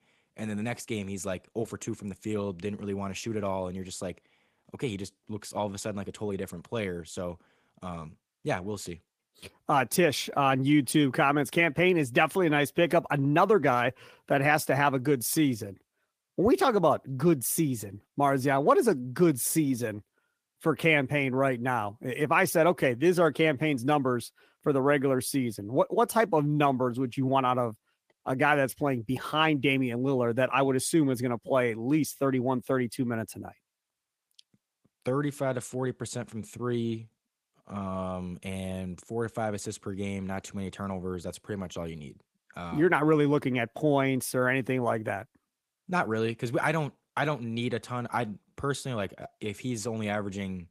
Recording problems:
garbled, watery; slightly; nothing above 15 kHz

